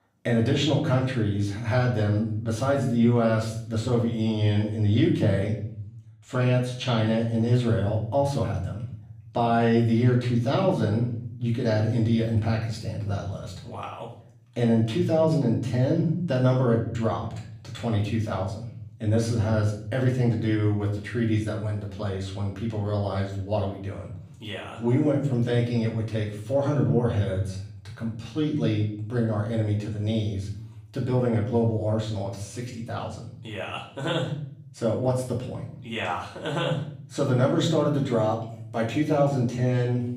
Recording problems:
off-mic speech; far
room echo; slight; dies away in 0.6 s

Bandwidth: 15.5 kHz